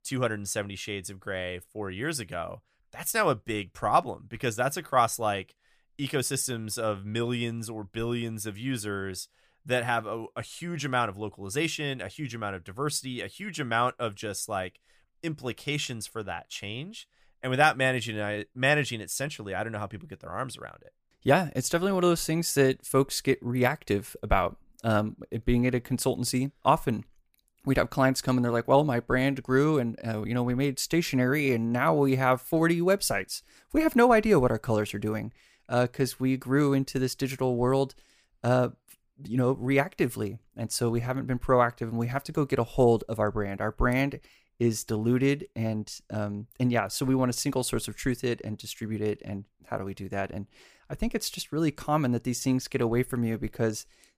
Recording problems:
none

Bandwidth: 15 kHz